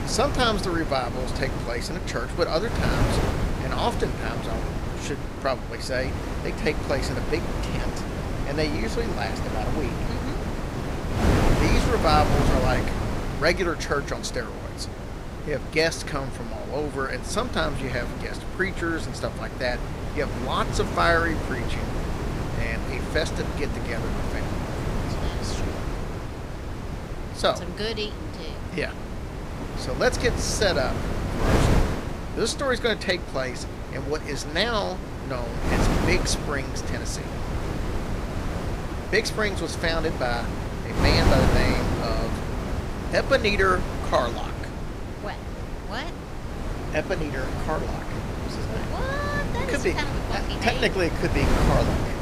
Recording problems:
wind noise on the microphone; heavy; 5 dB below the speech

